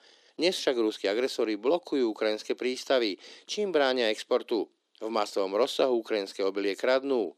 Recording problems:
thin; somewhat; fading below 300 Hz

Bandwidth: 14.5 kHz